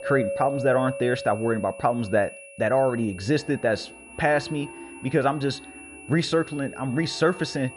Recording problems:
muffled; slightly; fading above 3 kHz
high-pitched whine; noticeable; throughout; 2.5 kHz, 20 dB below the speech
background music; noticeable; throughout; 15 dB below the speech

